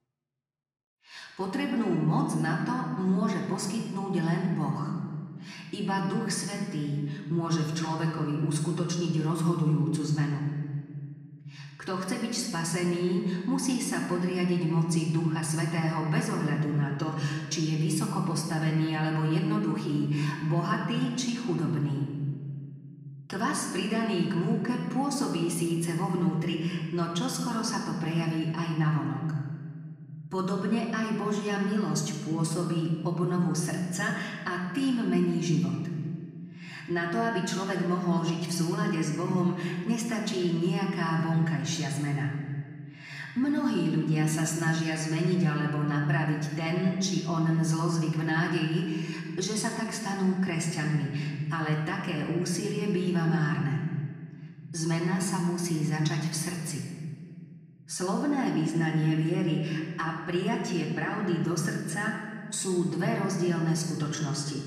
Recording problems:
off-mic speech; far
room echo; noticeable; dies away in 1.8 s

